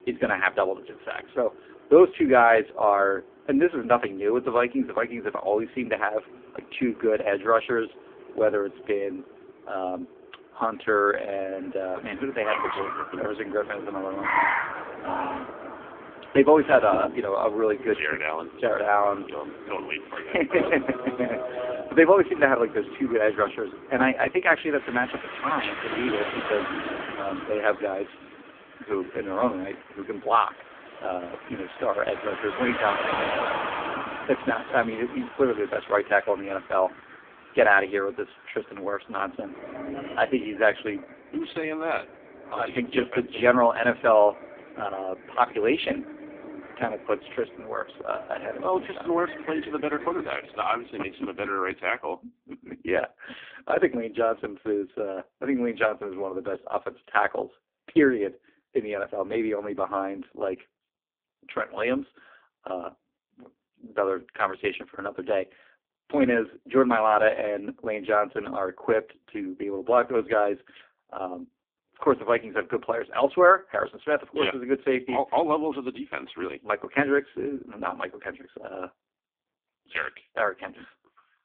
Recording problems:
phone-call audio; poor line
traffic noise; loud; until 51 s; 9 dB below the speech

